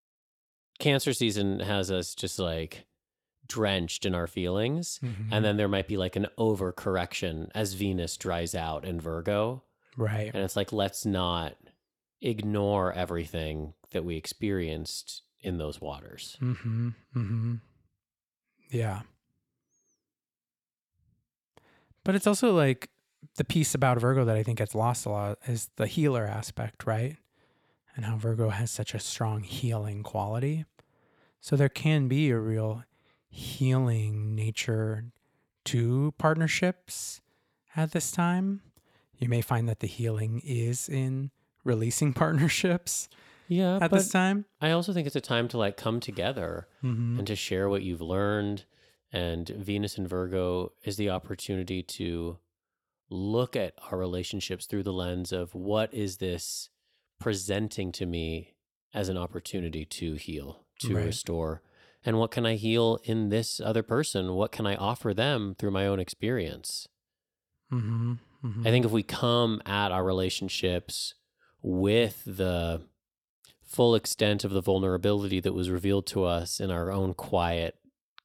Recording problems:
none

